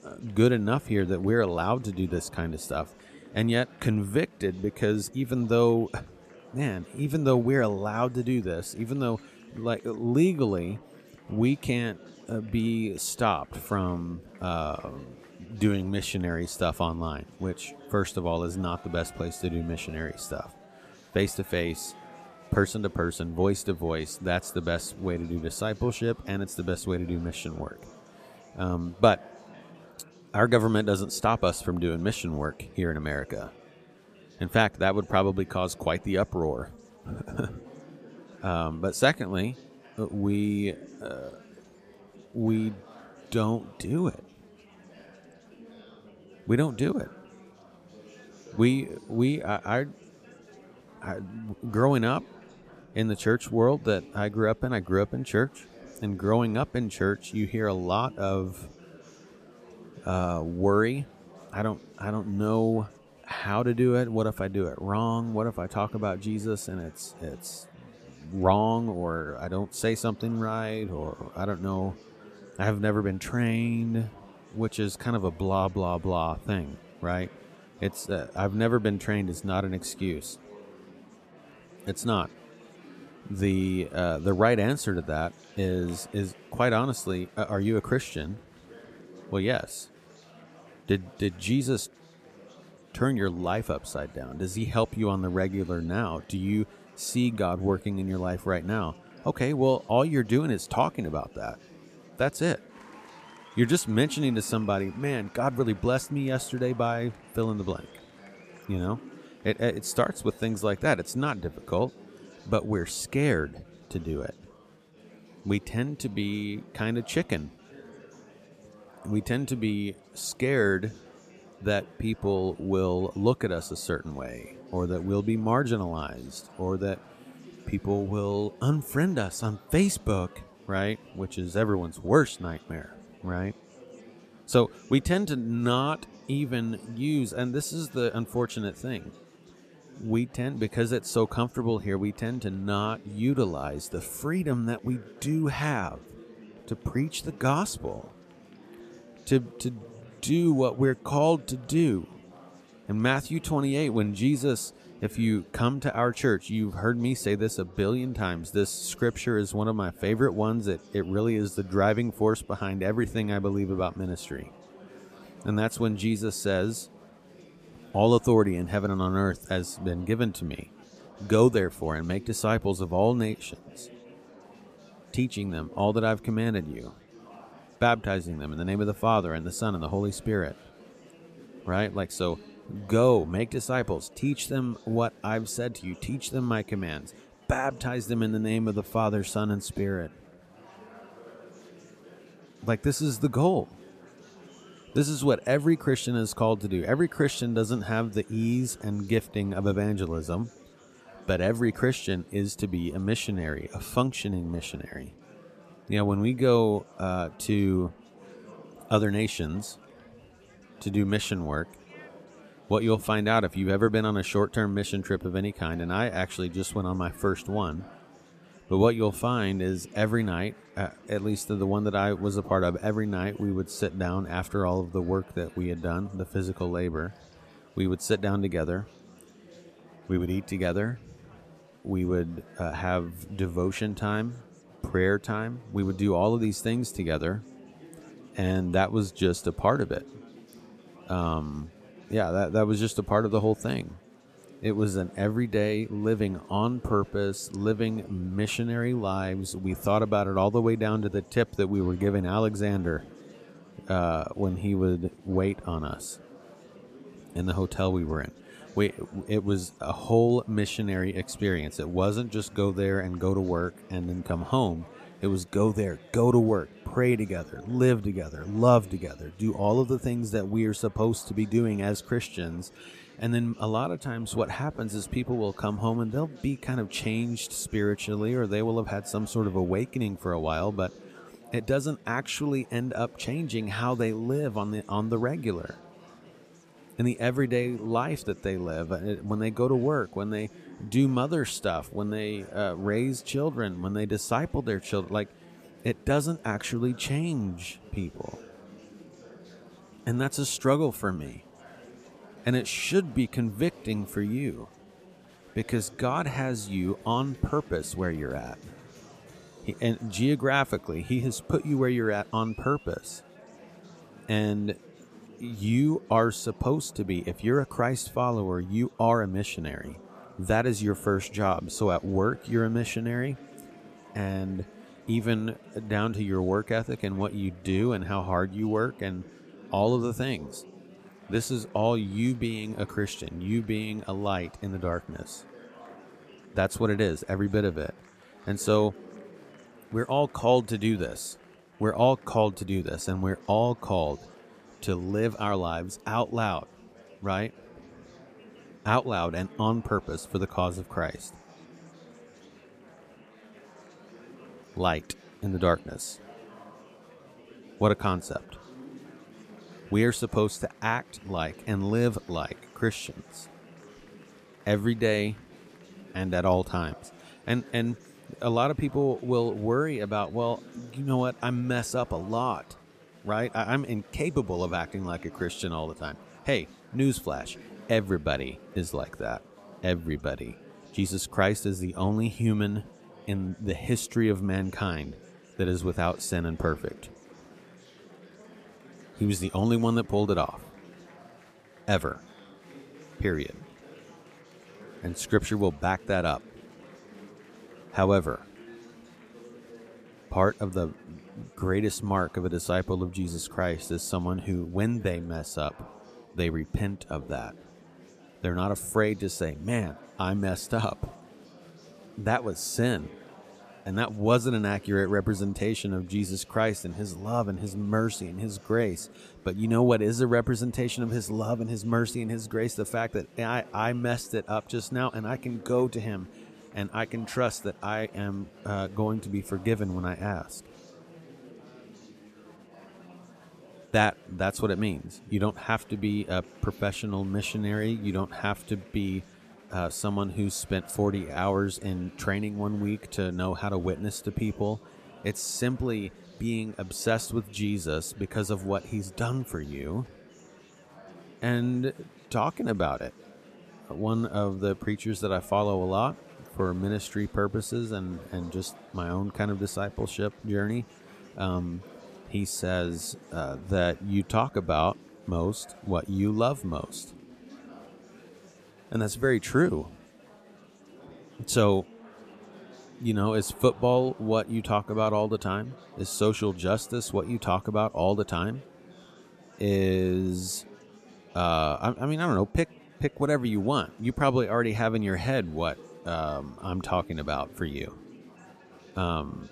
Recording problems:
chatter from many people; faint; throughout; 20 dB below the speech

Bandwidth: 14.5 kHz